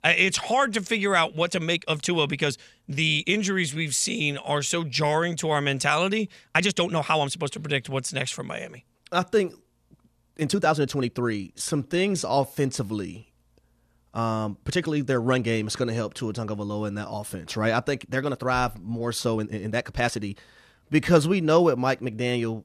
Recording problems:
uneven, jittery; strongly; from 1.5 to 21 s

